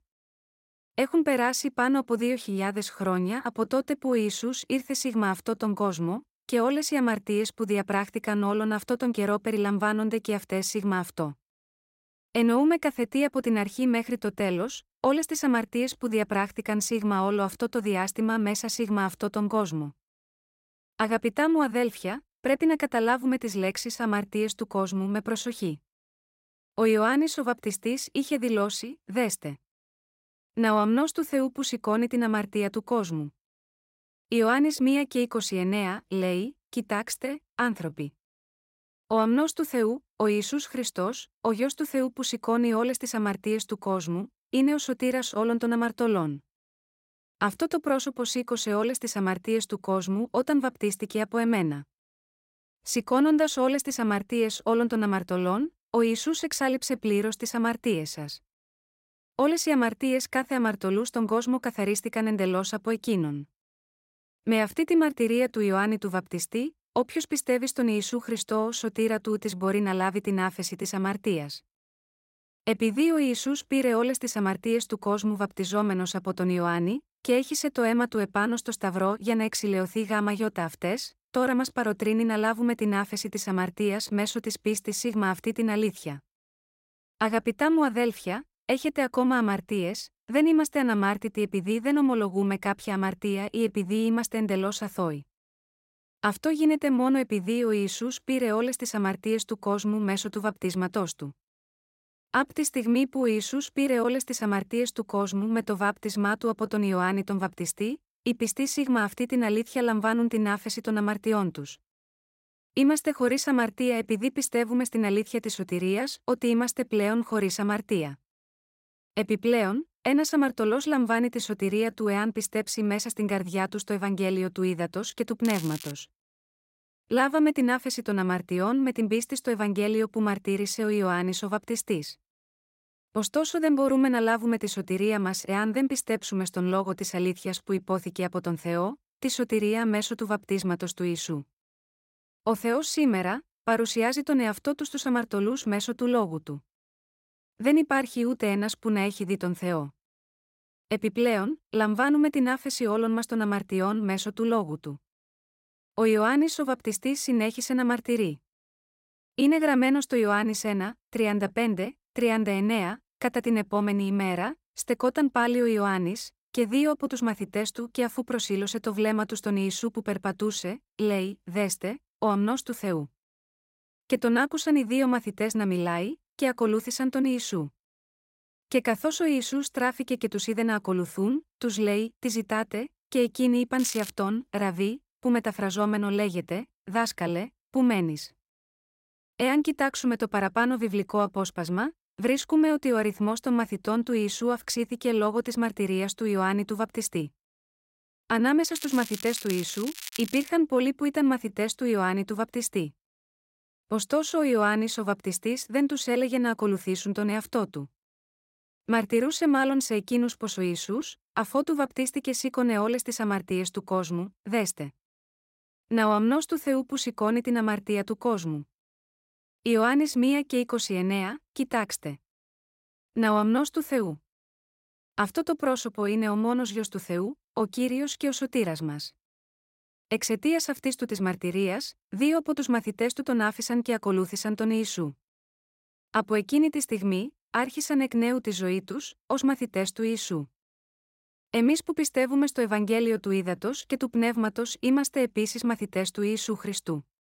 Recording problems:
crackling; noticeable; at 2:05, at 3:04 and from 3:19 to 3:20; 10 dB below the speech

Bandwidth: 16 kHz